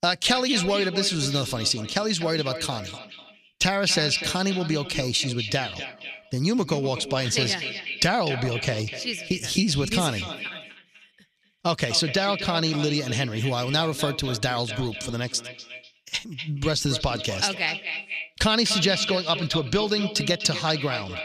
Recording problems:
echo of what is said; strong; throughout; 250 ms later, 8 dB below the speech

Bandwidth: 14.5 kHz